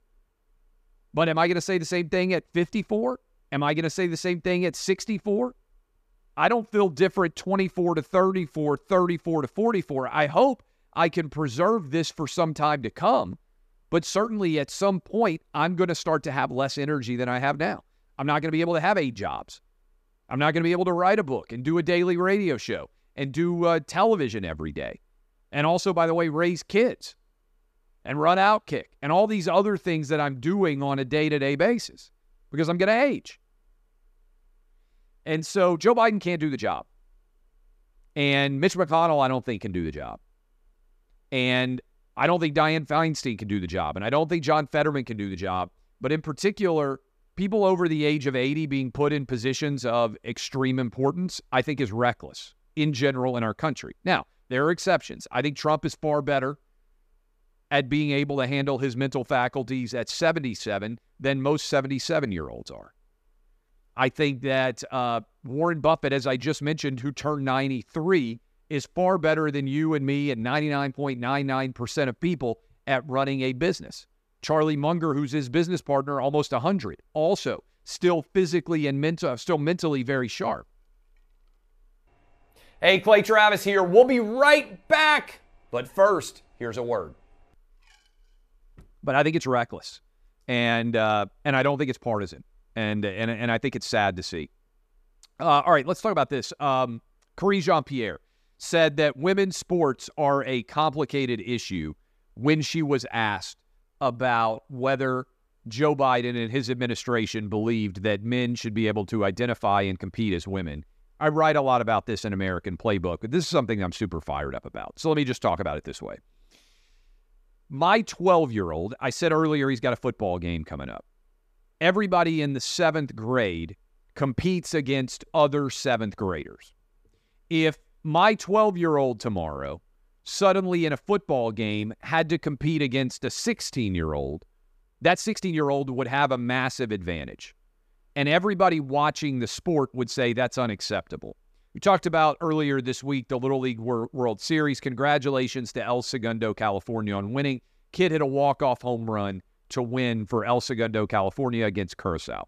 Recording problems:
uneven, jittery; strongly; from 8 s to 2:16

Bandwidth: 14.5 kHz